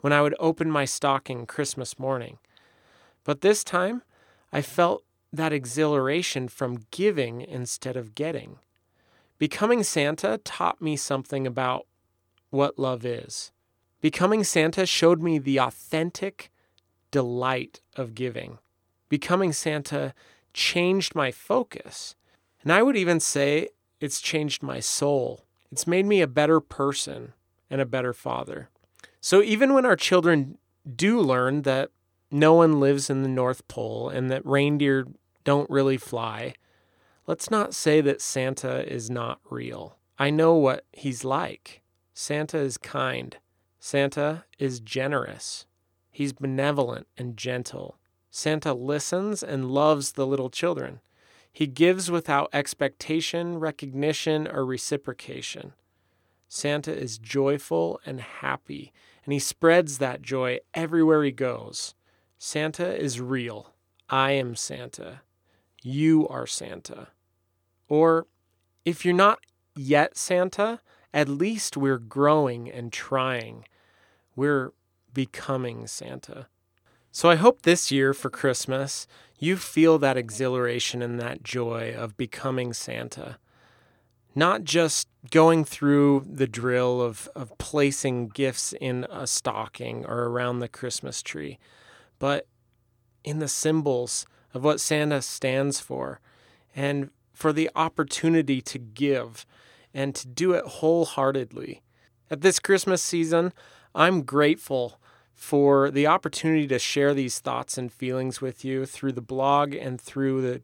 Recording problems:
none

